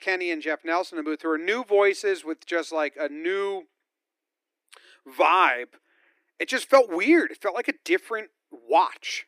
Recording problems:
thin; very; fading below 300 Hz

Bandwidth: 15 kHz